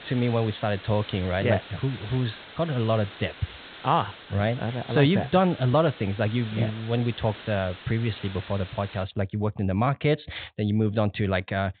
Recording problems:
high frequencies cut off; severe; nothing above 4 kHz
hiss; noticeable; until 9 s; 15 dB below the speech

